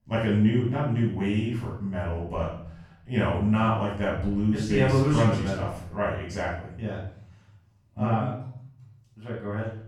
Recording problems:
off-mic speech; far
room echo; noticeable; dies away in 0.7 s

